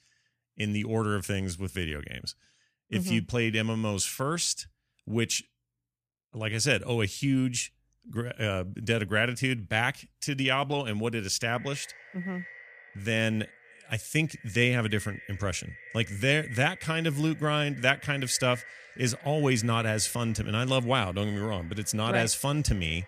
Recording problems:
echo of what is said; noticeable; from 11 s on; 560 ms later, 20 dB below the speech

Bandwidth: 14.5 kHz